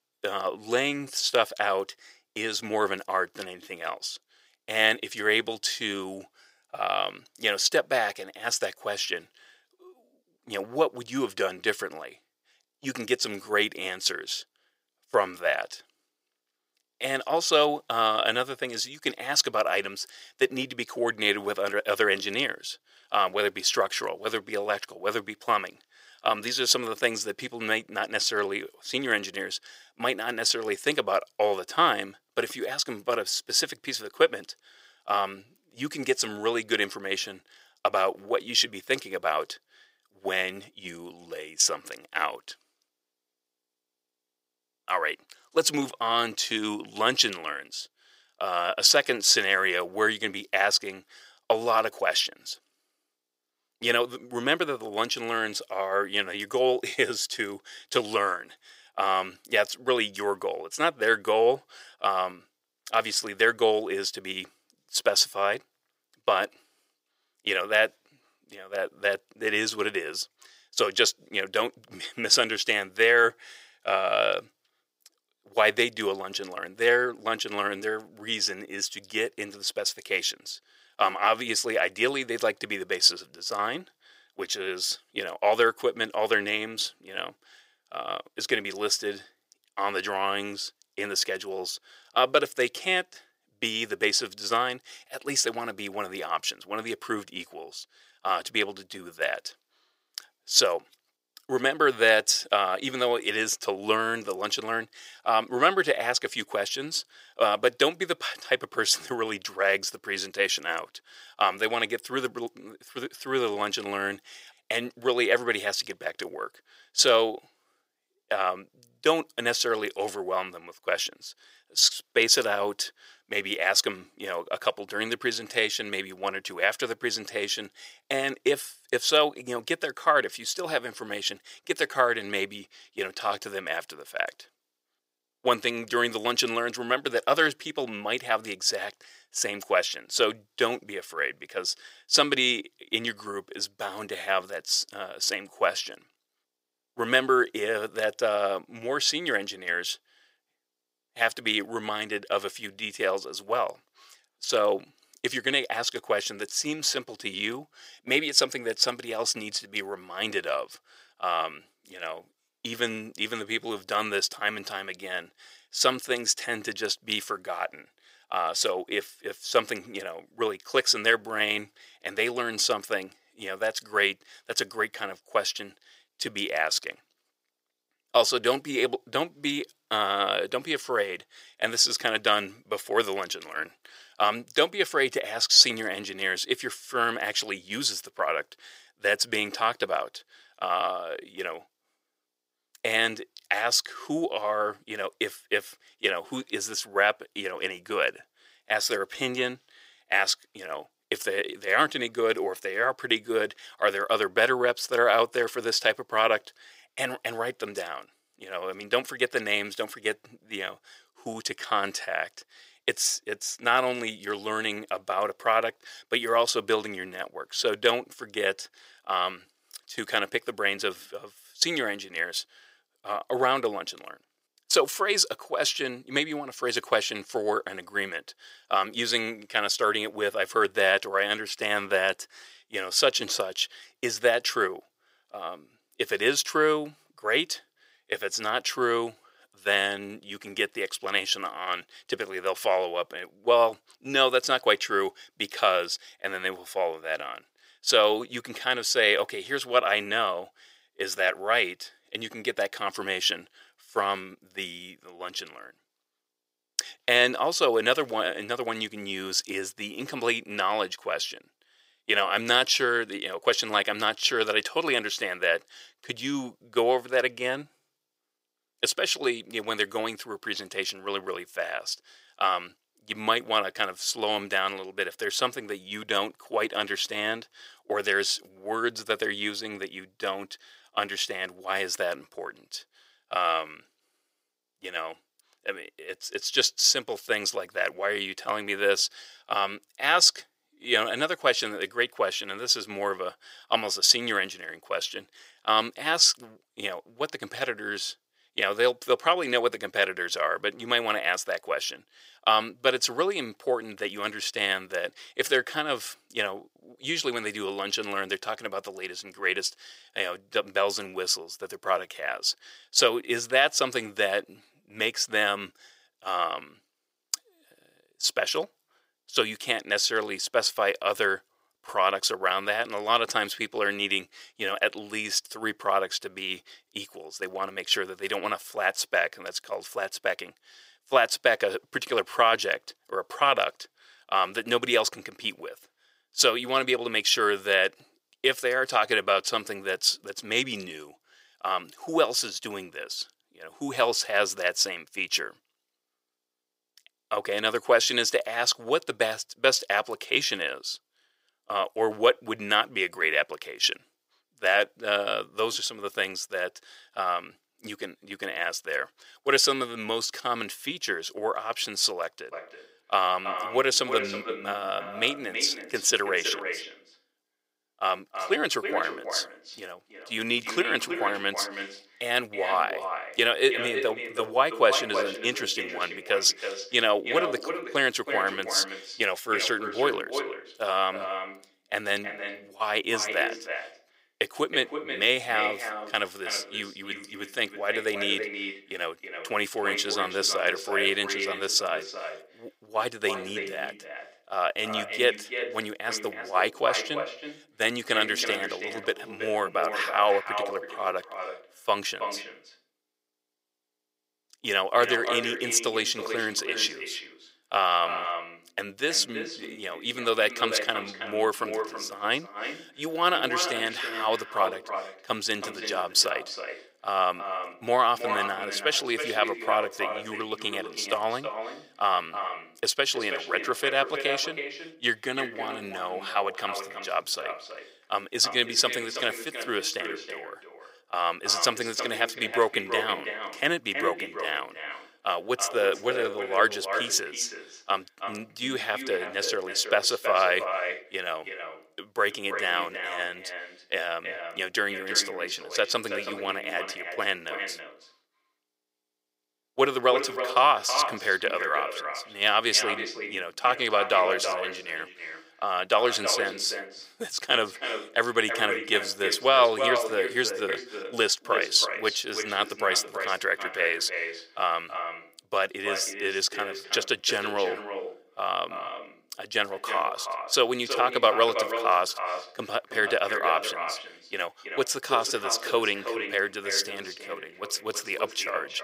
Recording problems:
echo of what is said; strong; from 6:03 on; 320 ms later, 8 dB below the speech
thin; very; fading below 500 Hz

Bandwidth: 15.5 kHz